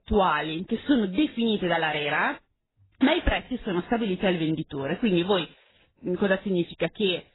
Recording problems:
garbled, watery; badly; nothing above 4 kHz
high frequencies cut off; slight

